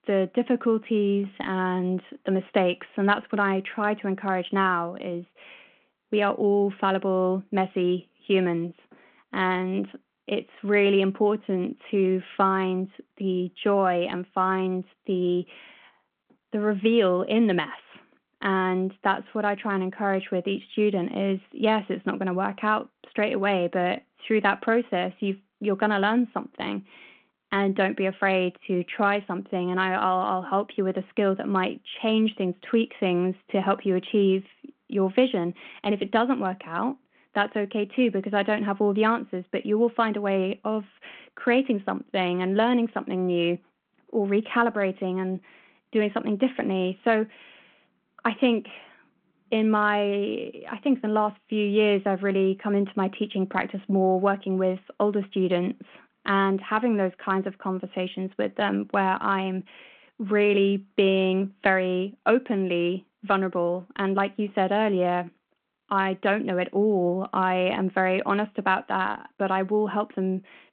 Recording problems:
phone-call audio

